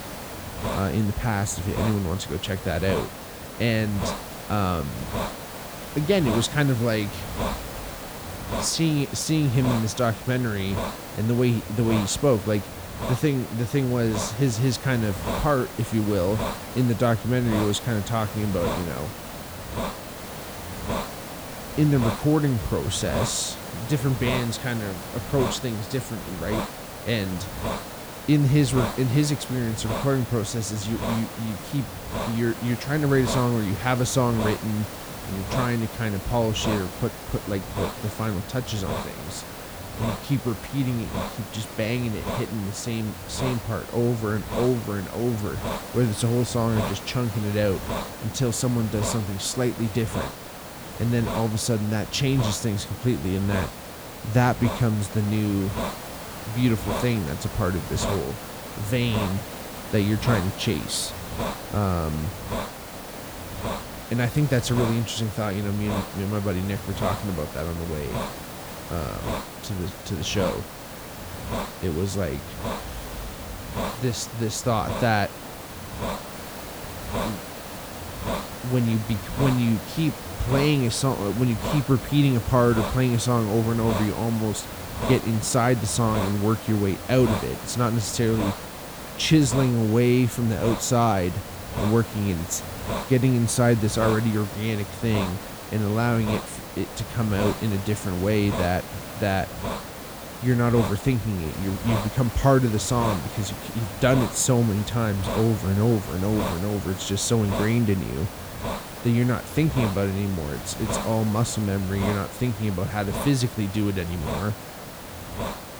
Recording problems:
hiss; loud; throughout; 8 dB below the speech

